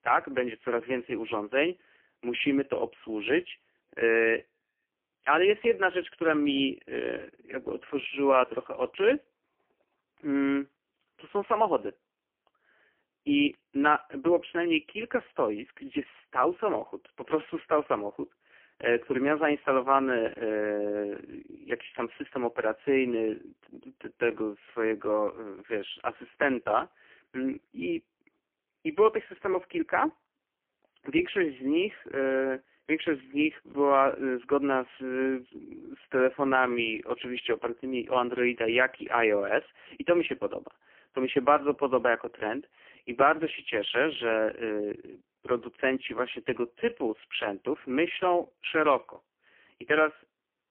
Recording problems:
phone-call audio; poor line; nothing above 3 kHz

